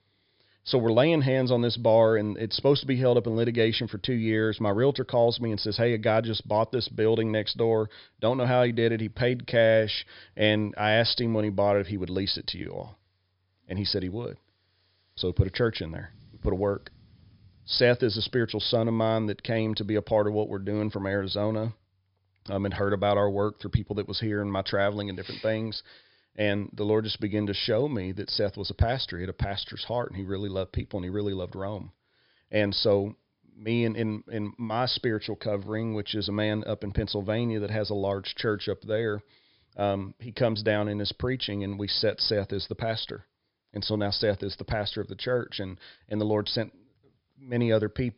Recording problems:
high frequencies cut off; noticeable; nothing above 5.5 kHz

